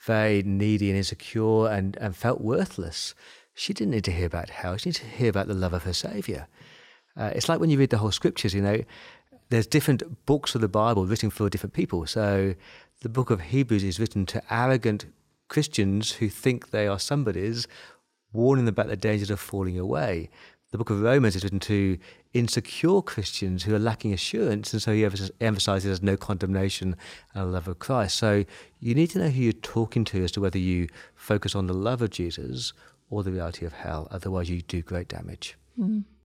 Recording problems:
uneven, jittery; strongly; from 11 to 30 s

